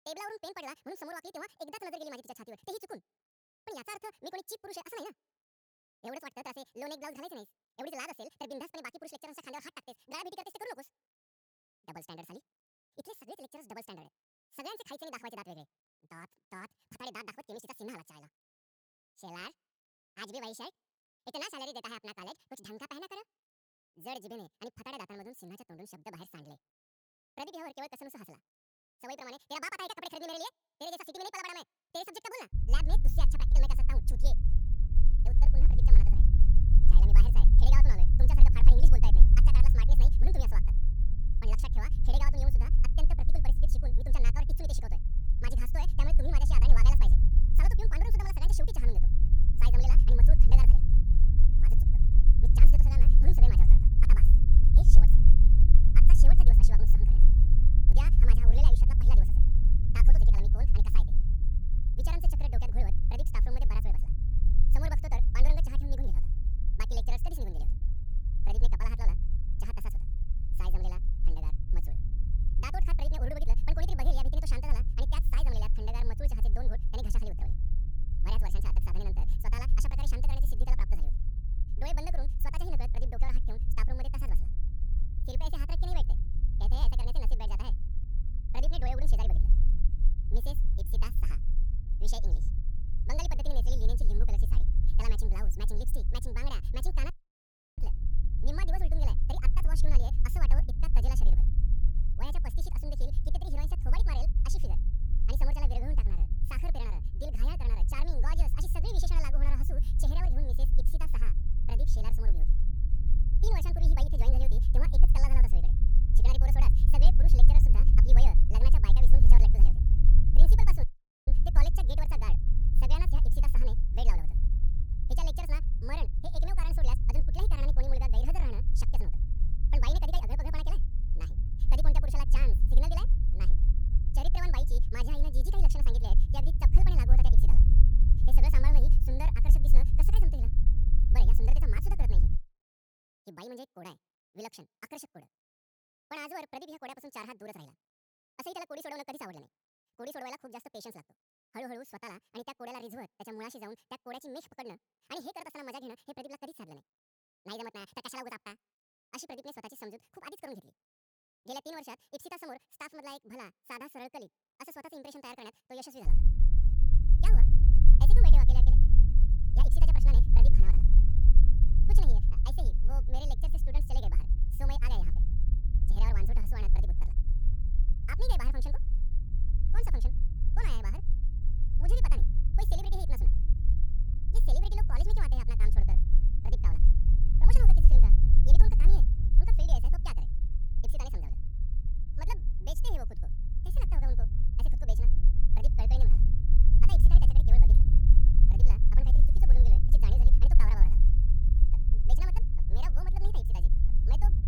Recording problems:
wrong speed and pitch; too fast and too high; 1.7 times normal speed
low rumble; loud; from 33 s to 2:22 and from 2:46 on; 6 dB below the speech
audio cutting out; at 1:37 for 0.5 s and at 2:01

